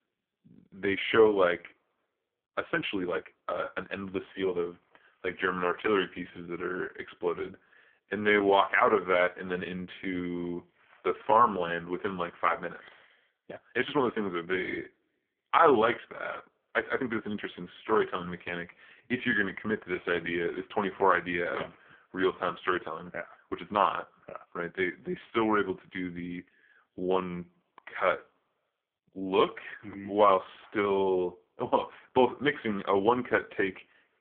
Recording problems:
phone-call audio; poor line
uneven, jittery; strongly; from 2.5 to 30 s

